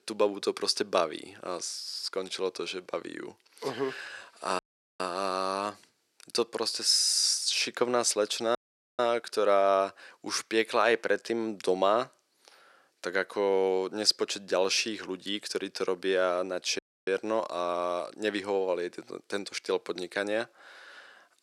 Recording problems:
thin; somewhat; fading below 300 Hz
audio cutting out; at 4.5 s, at 8.5 s and at 17 s

